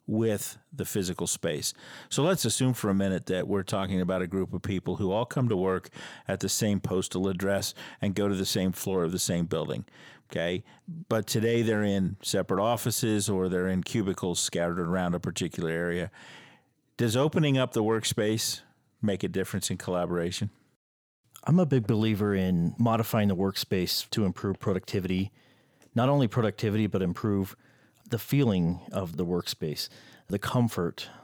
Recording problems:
none

